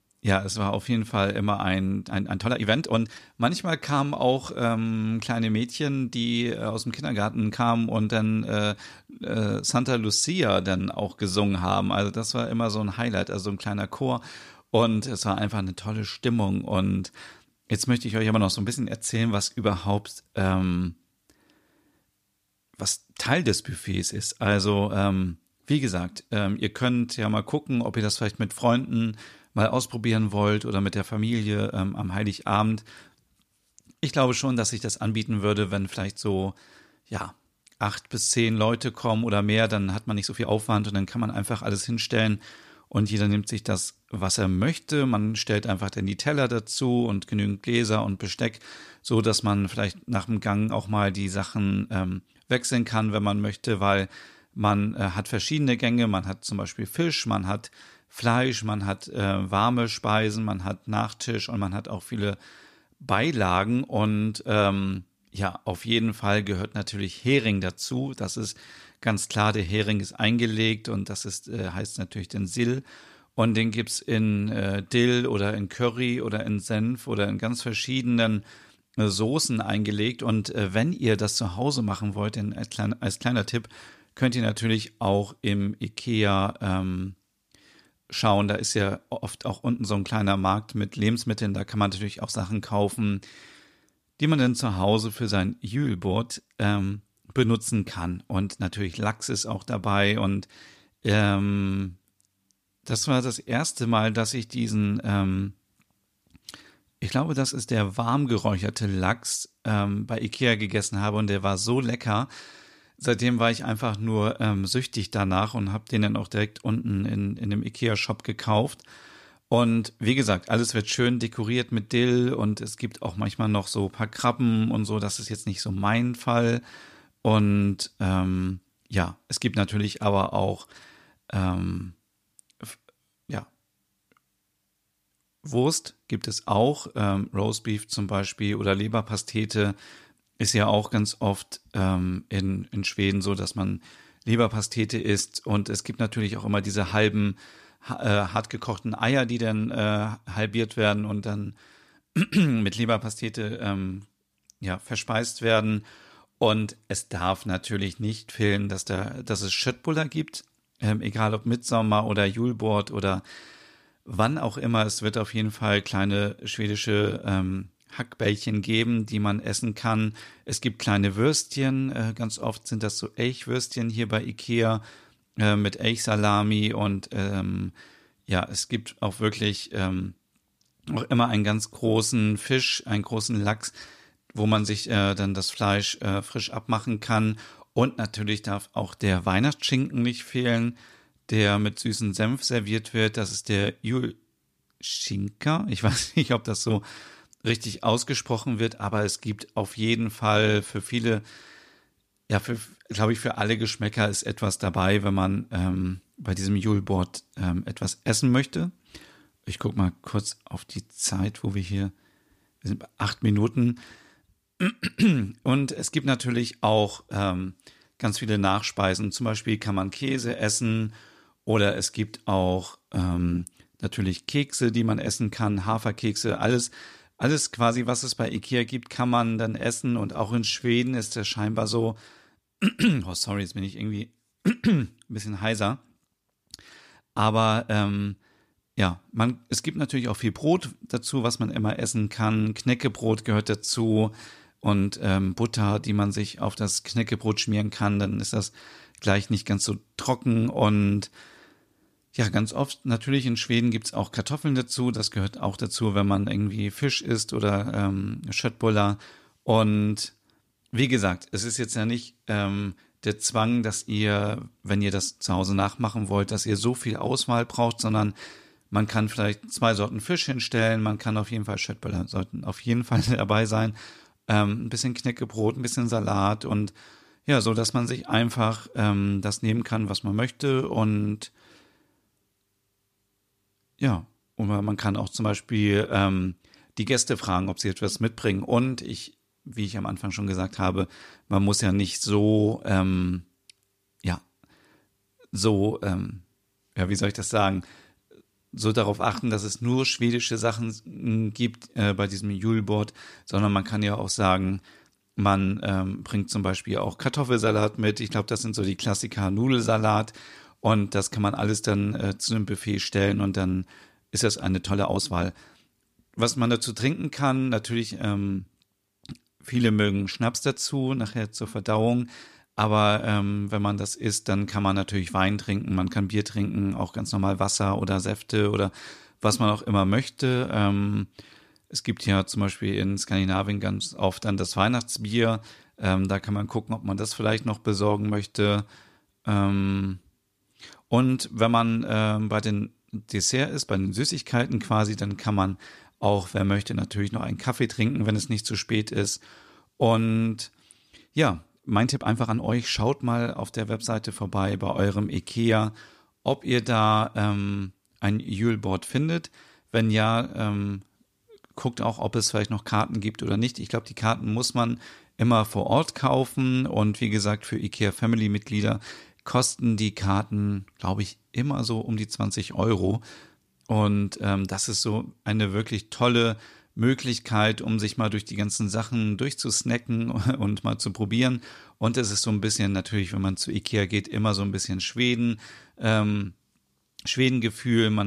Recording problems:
uneven, jittery; strongly; from 2 s to 6:24
abrupt cut into speech; at the end

